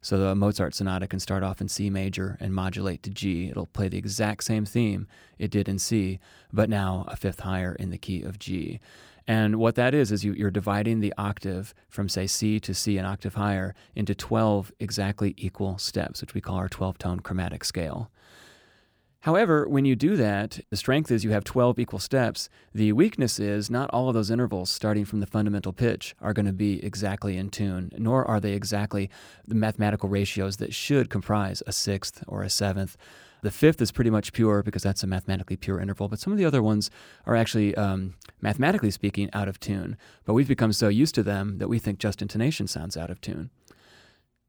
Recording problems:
none

